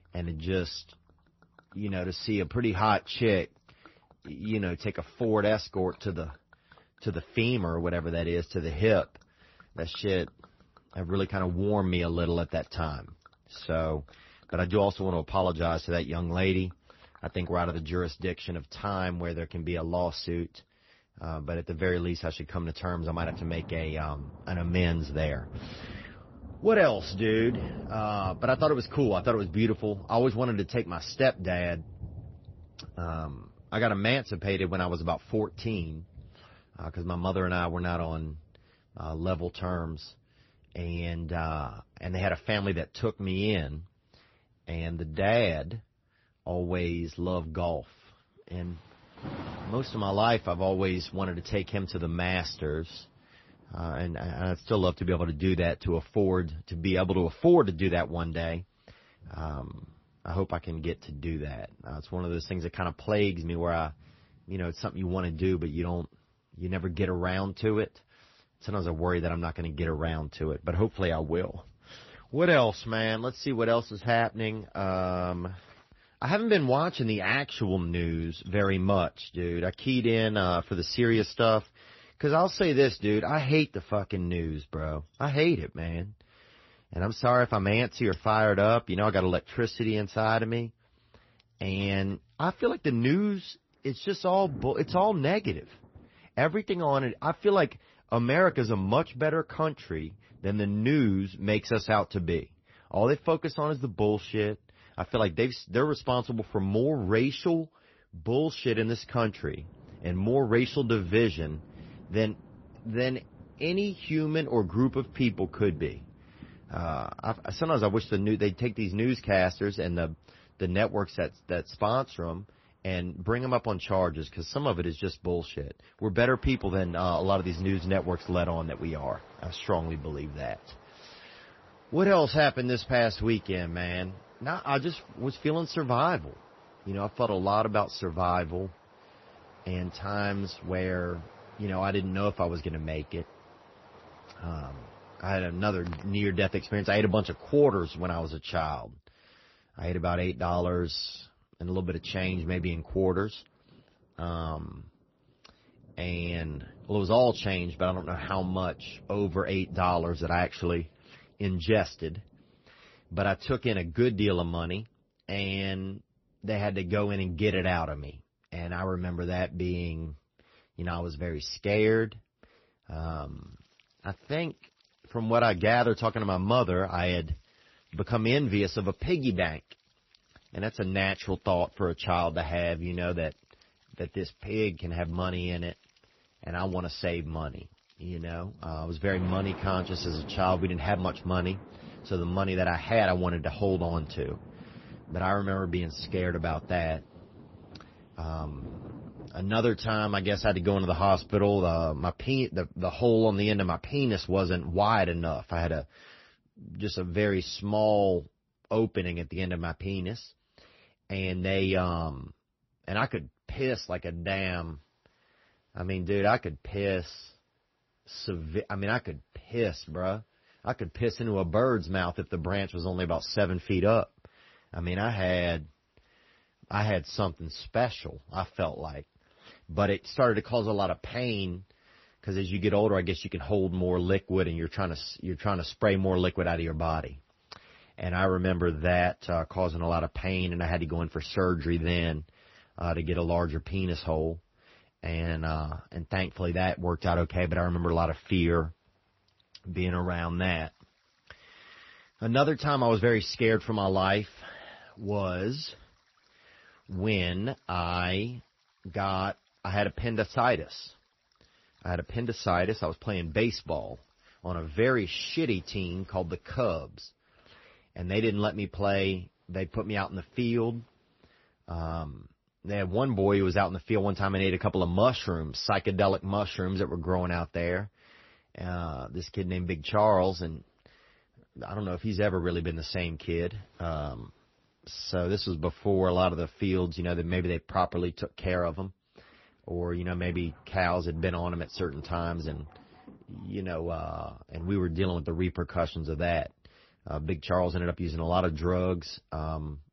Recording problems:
garbled, watery; slightly; nothing above 5.5 kHz
rain or running water; faint; throughout; 20 dB below the speech

